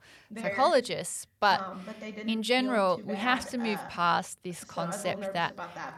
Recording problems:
voice in the background; loud; throughout; 10 dB below the speech

